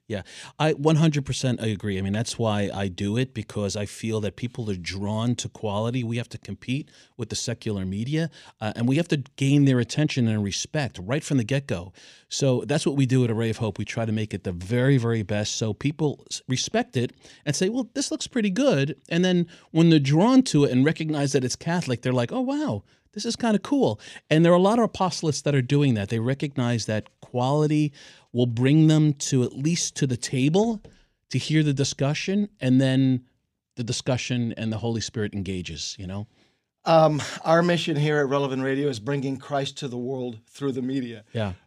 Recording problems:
none

